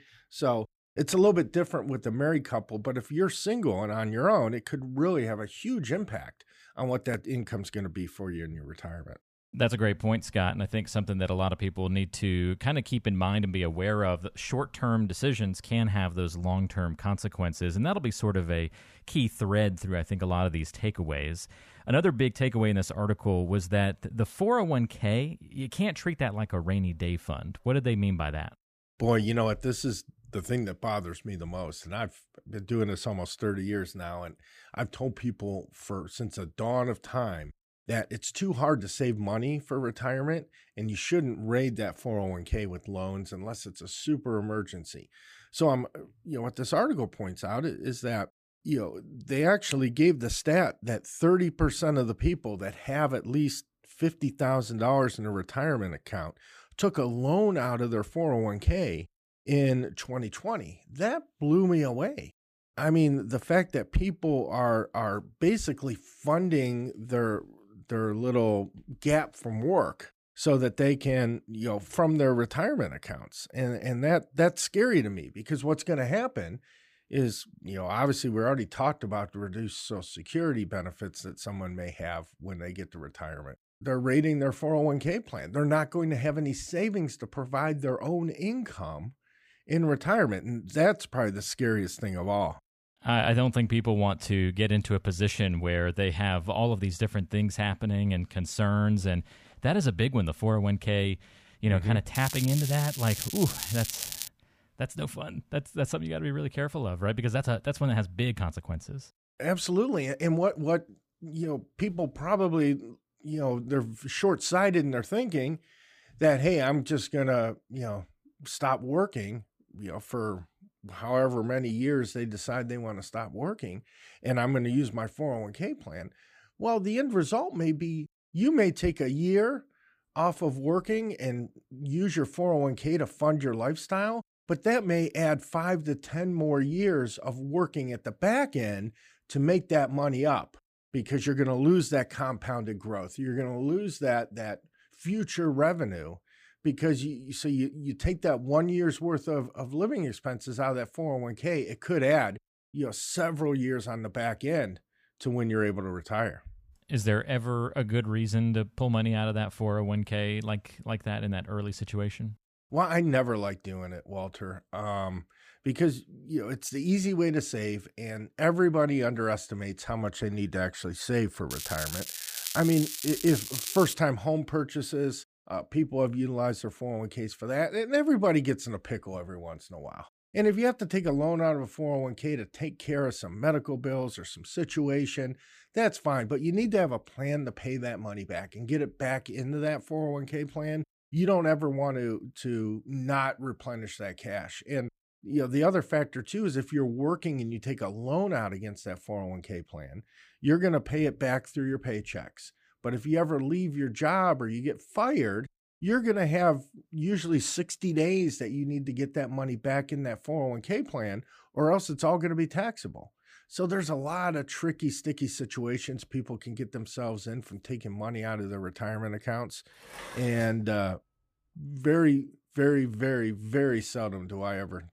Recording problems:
crackling; loud; from 1:42 to 1:44 and from 2:52 to 2:54; 5 dB below the speech
clattering dishes; faint; at 3:40; peak 15 dB below the speech

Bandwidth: 15 kHz